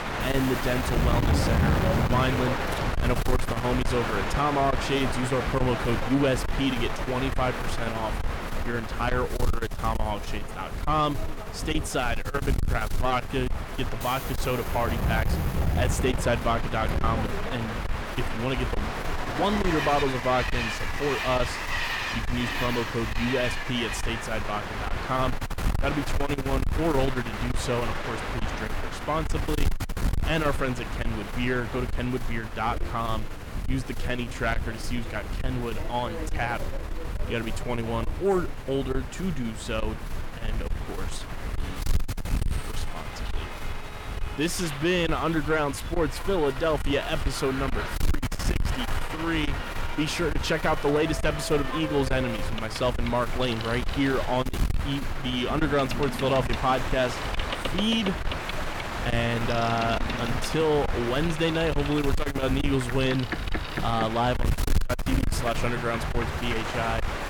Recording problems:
distortion; heavy; 6 dB below the speech
train or aircraft noise; loud; throughout; 4 dB below the speech
wind noise on the microphone; occasional gusts; 15 dB below the speech

